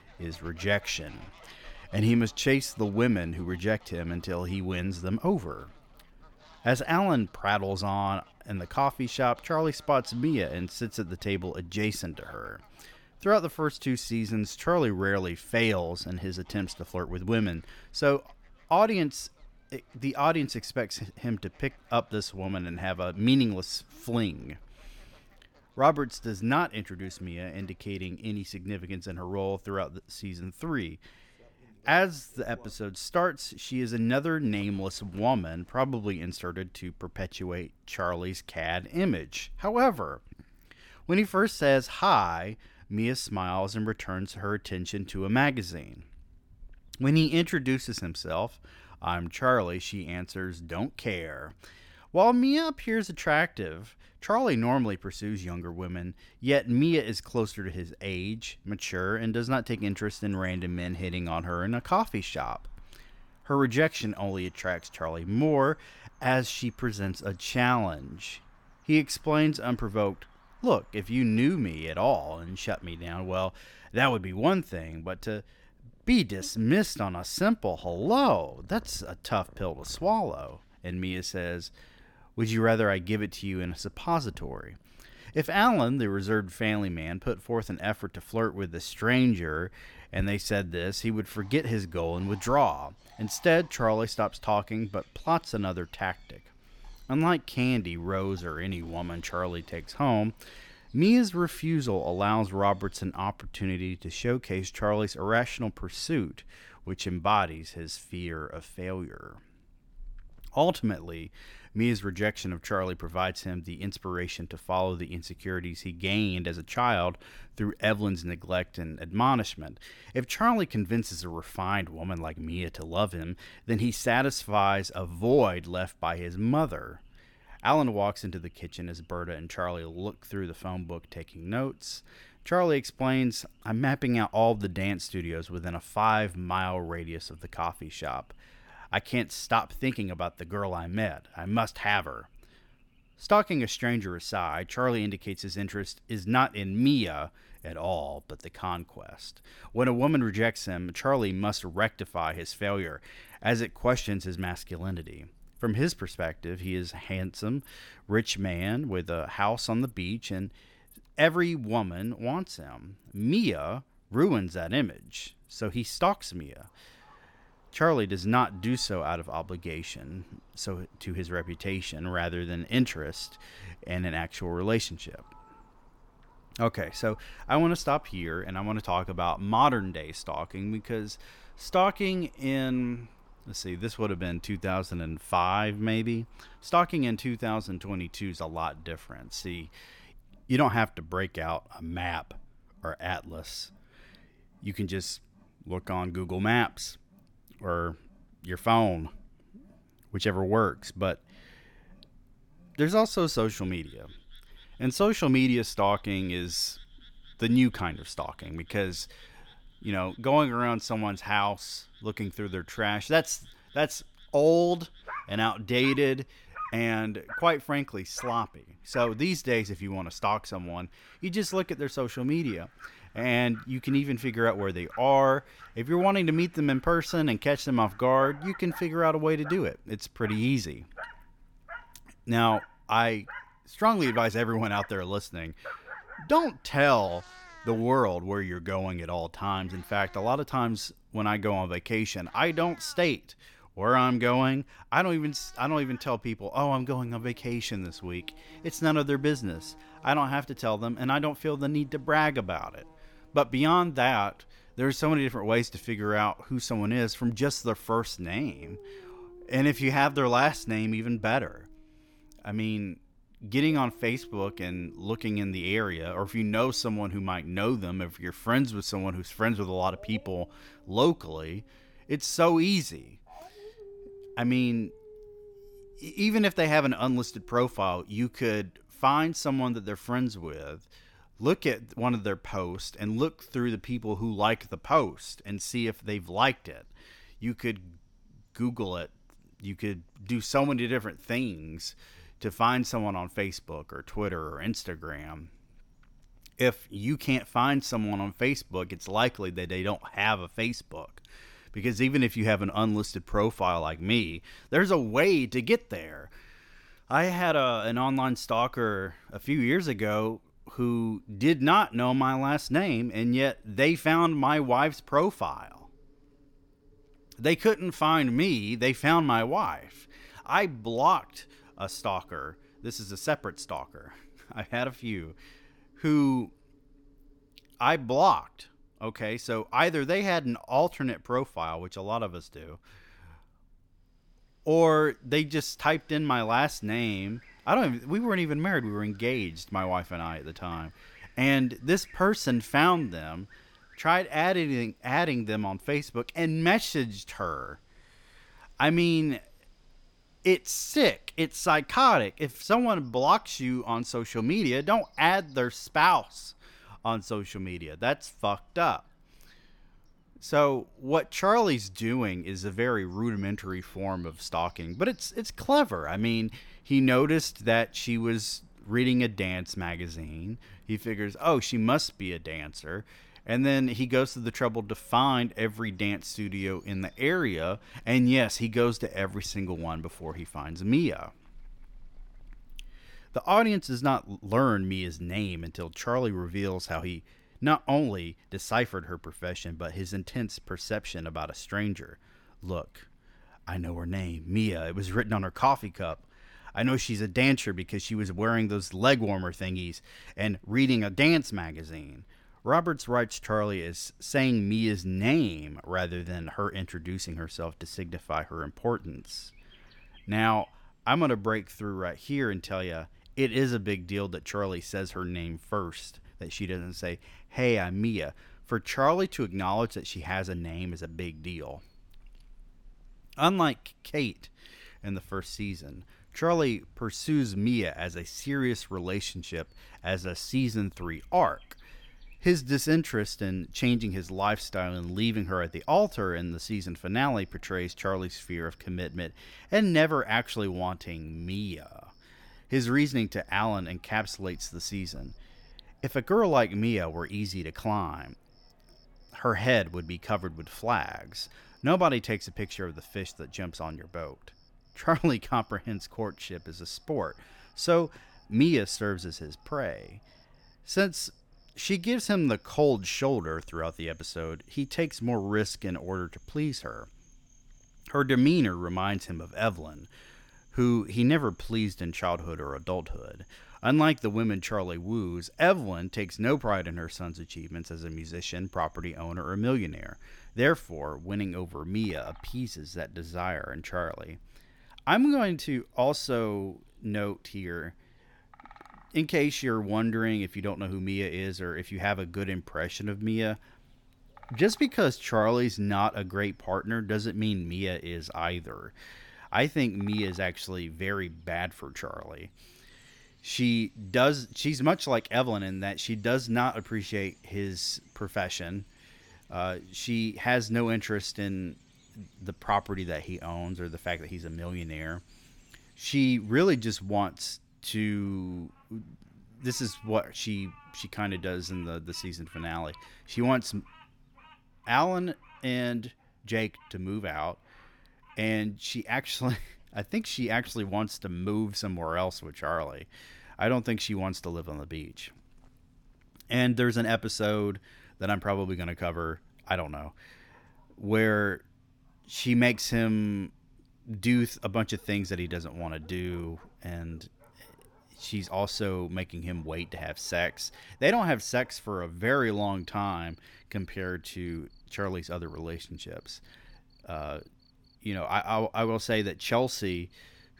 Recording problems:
animal sounds; faint; throughout; 25 dB below the speech

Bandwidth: 17.5 kHz